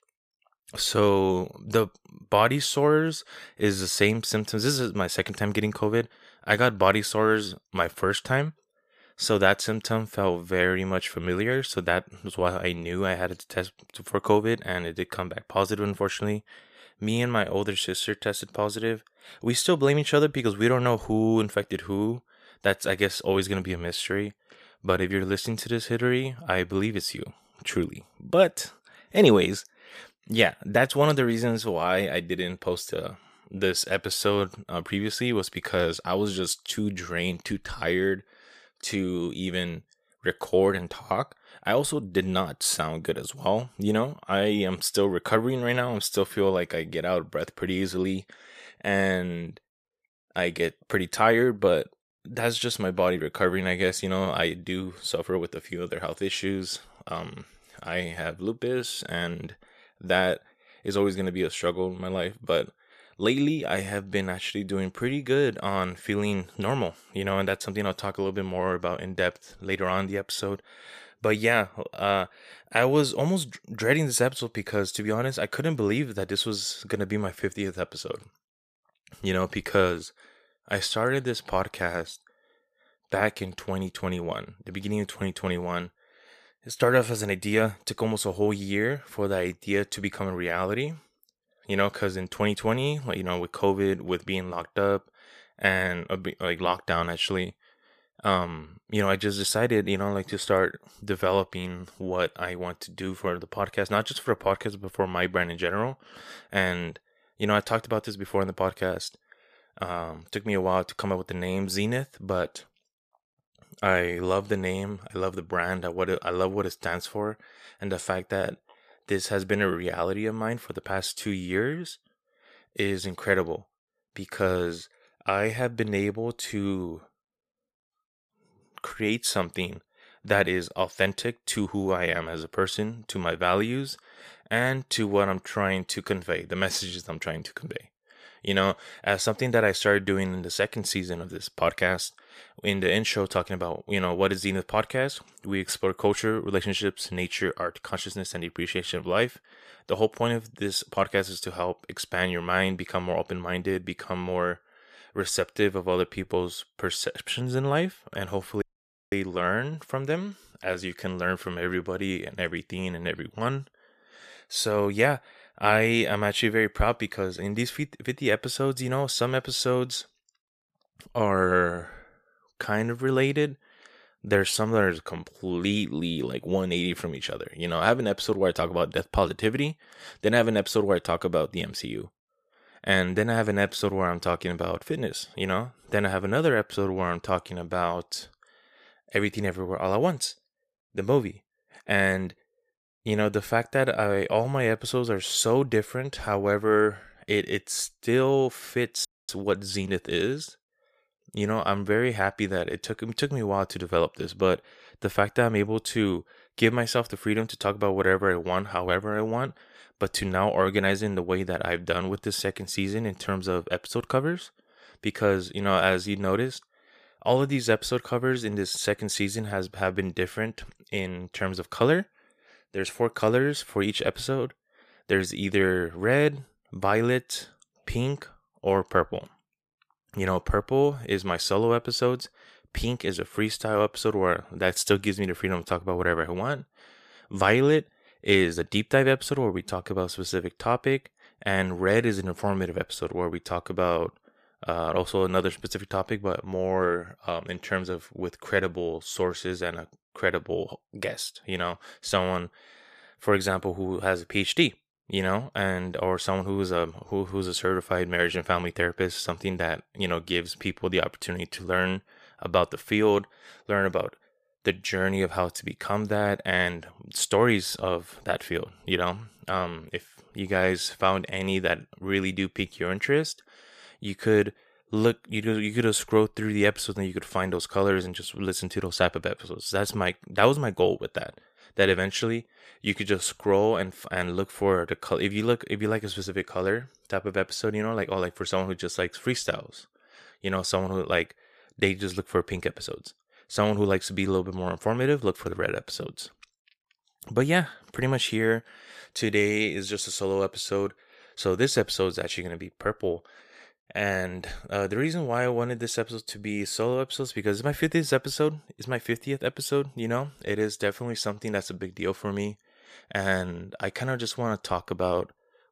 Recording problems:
audio cutting out; at 2:39 for 0.5 s and at 3:19

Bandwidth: 14.5 kHz